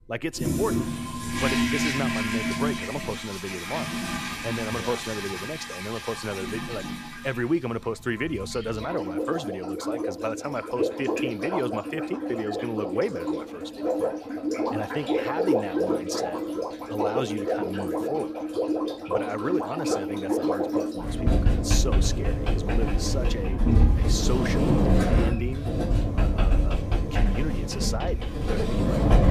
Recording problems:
household noises; very loud; throughout; 5 dB above the speech

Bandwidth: 14.5 kHz